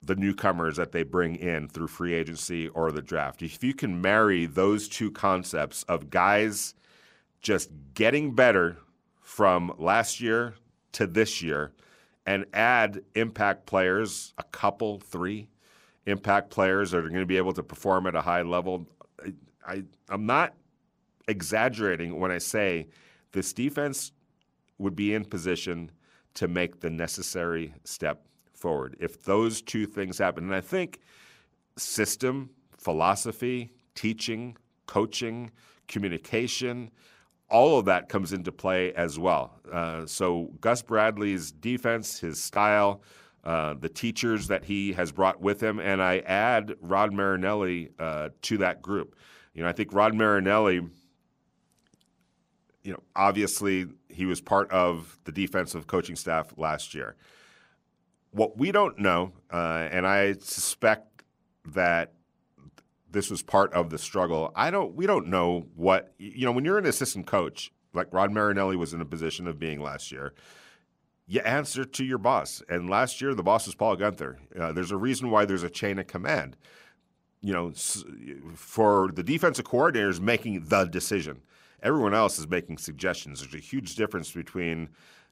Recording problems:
none

